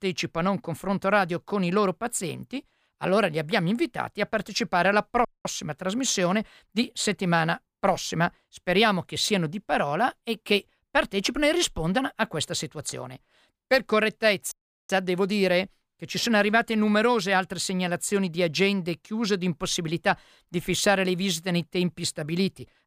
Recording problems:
audio cutting out; at 5.5 s and at 15 s

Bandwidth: 15 kHz